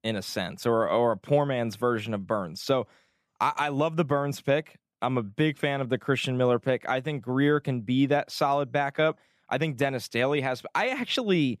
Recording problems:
none

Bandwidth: 14.5 kHz